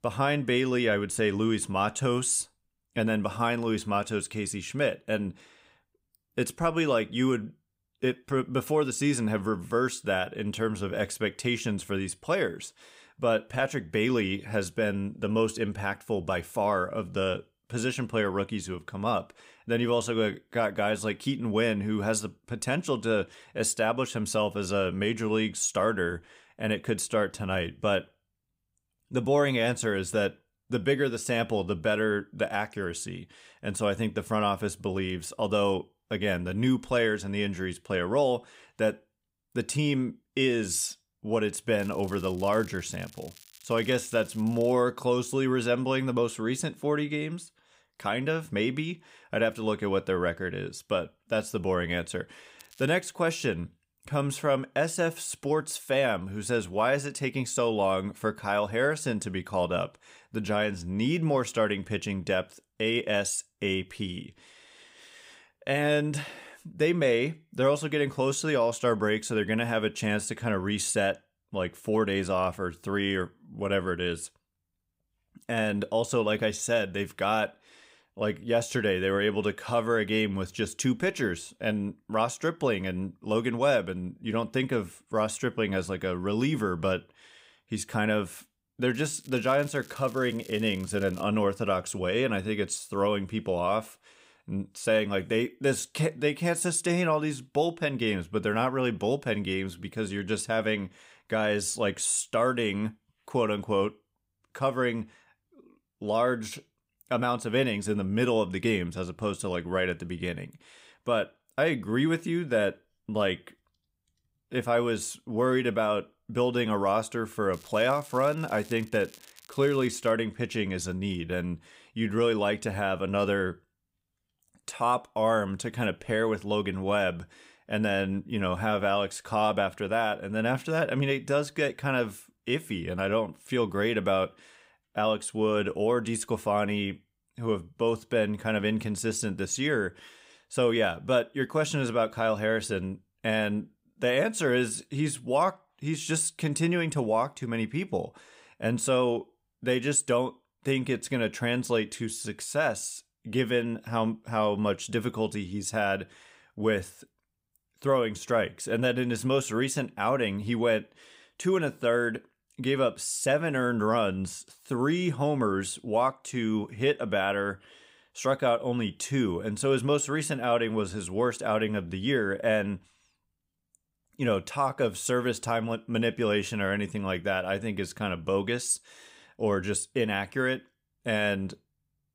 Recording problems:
crackling; faint; 4 times, first at 42 s; 25 dB below the speech

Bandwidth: 15.5 kHz